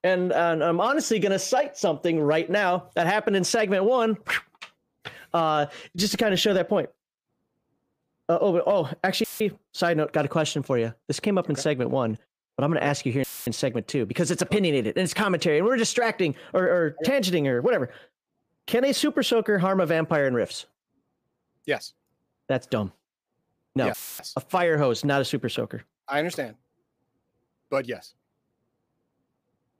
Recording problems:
audio cutting out; filled with static; at 9 s, at 13 s and at 24 s

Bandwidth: 15 kHz